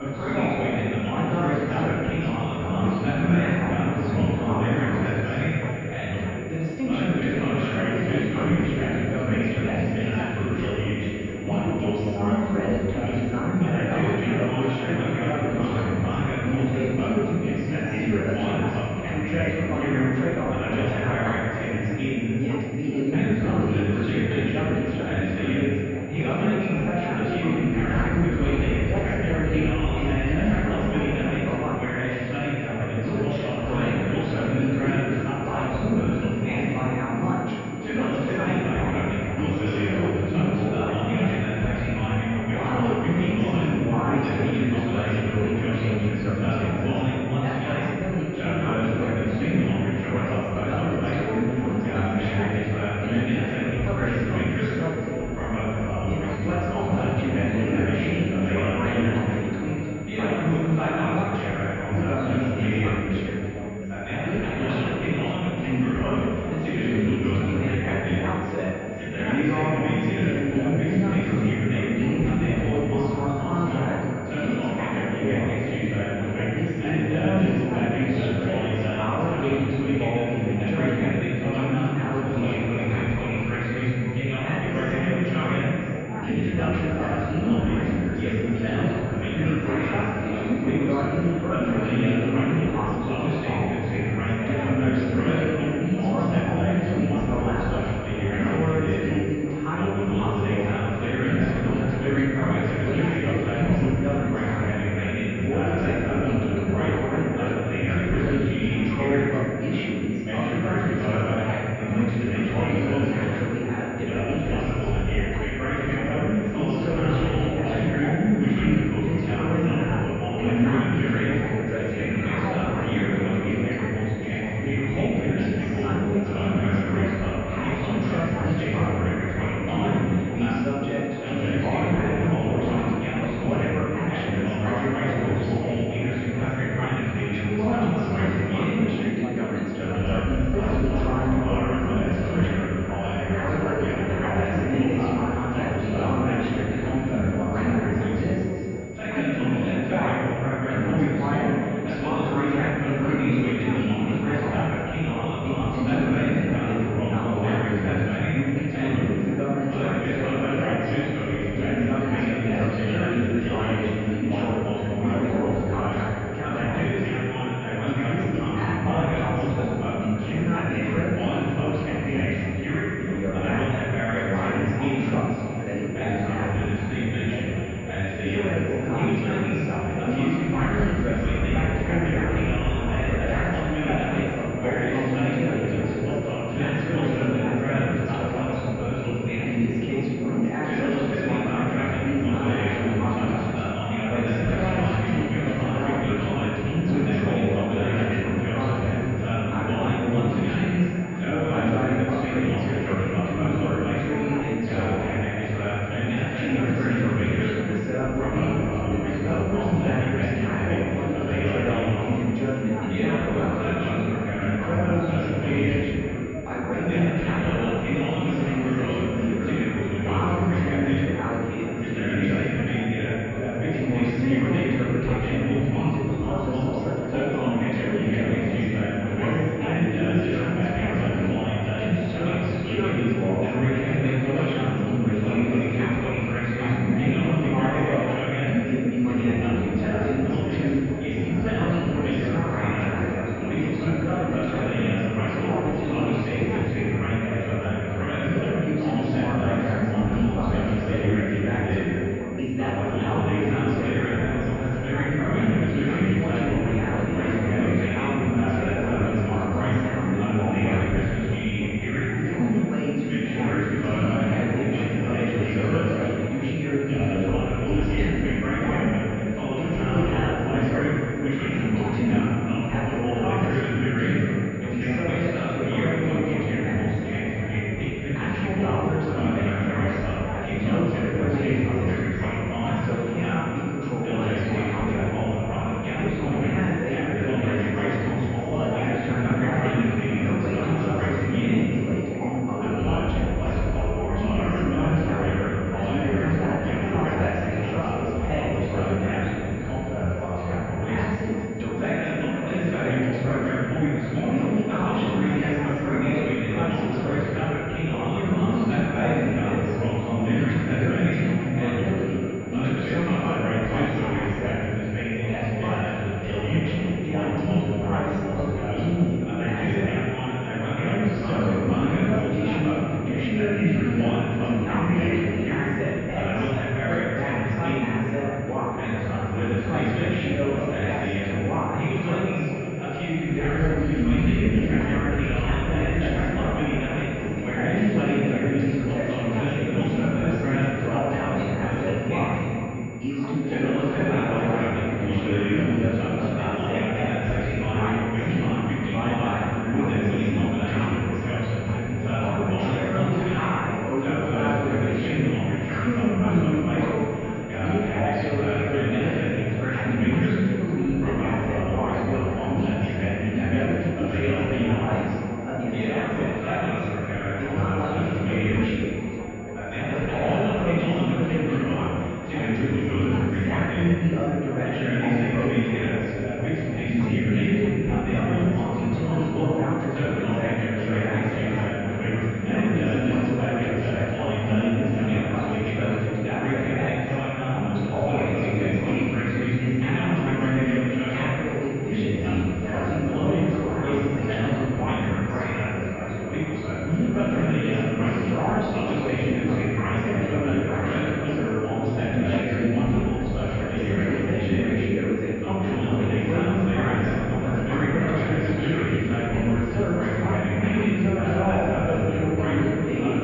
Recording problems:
room echo; strong; dies away in 2 s
off-mic speech; far
muffled; very; fading above 2.5 kHz
chatter from many people; very loud; throughout; as loud as the speech
high-pitched whine; faint; throughout; 2 kHz, 20 dB below the speech

